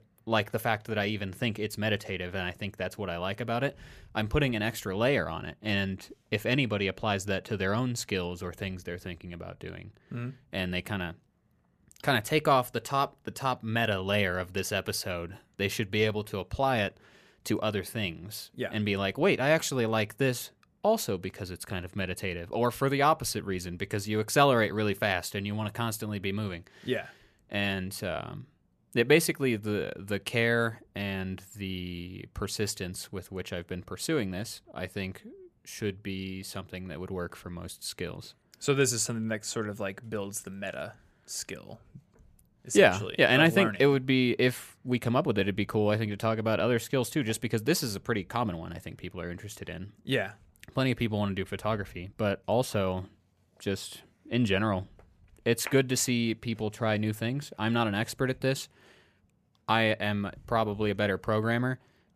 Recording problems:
none

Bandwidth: 14.5 kHz